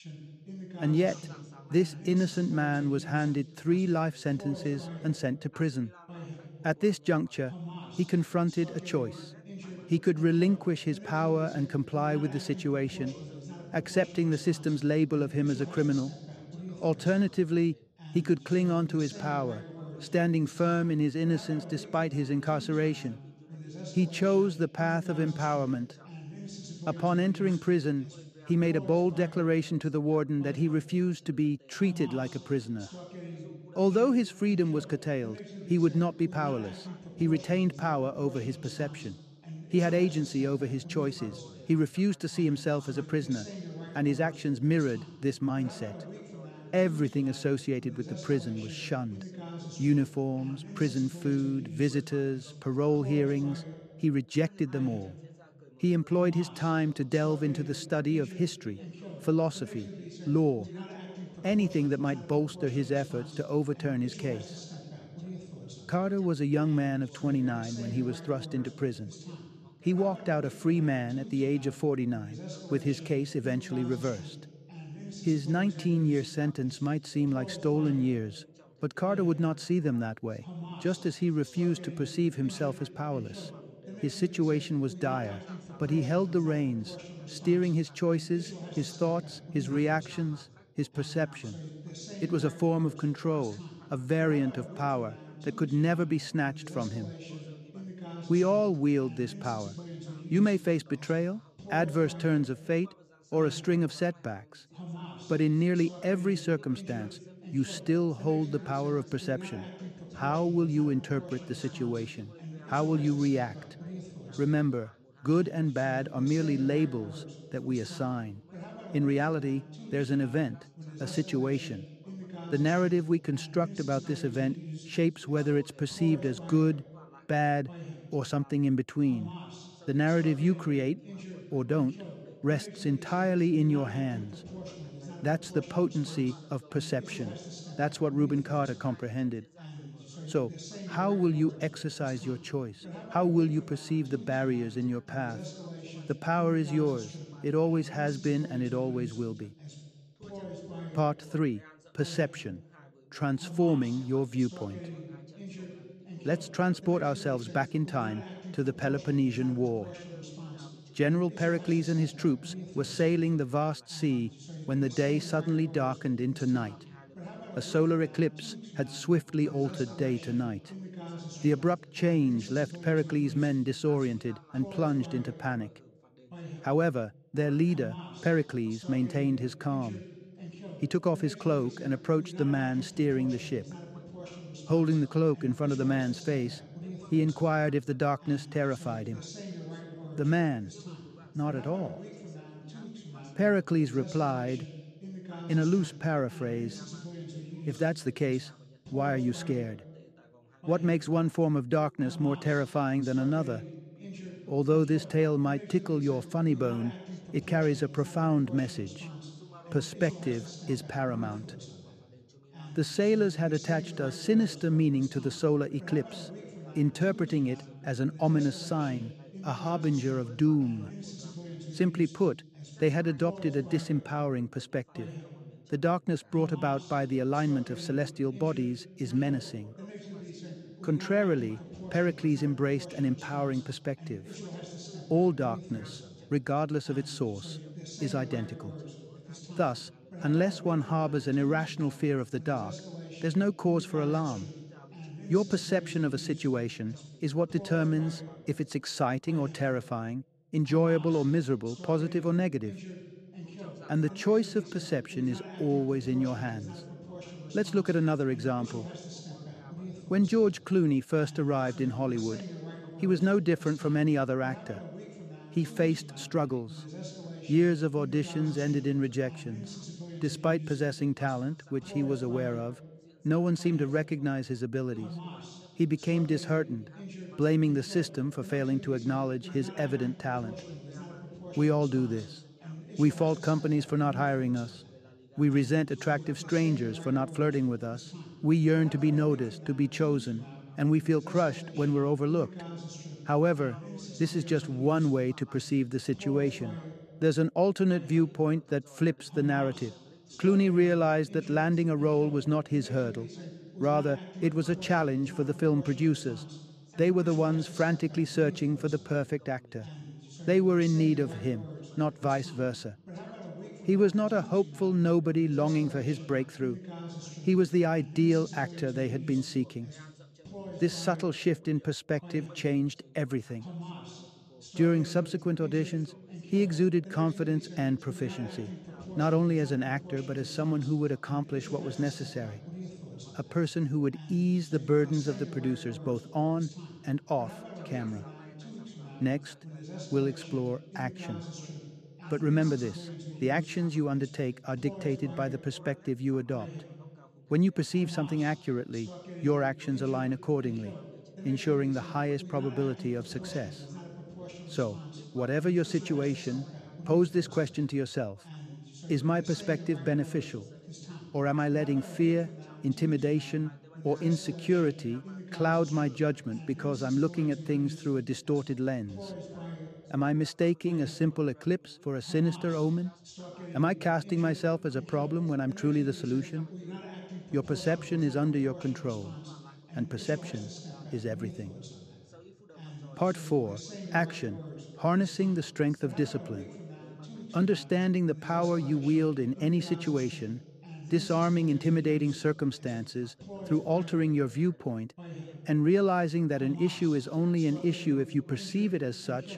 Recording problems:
background chatter; noticeable; throughout; 2 voices, 15 dB below the speech

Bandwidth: 14.5 kHz